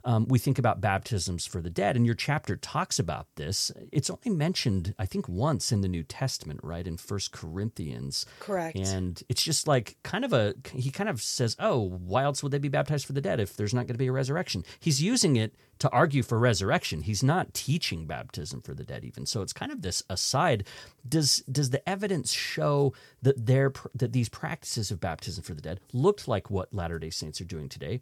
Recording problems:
none

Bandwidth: 18.5 kHz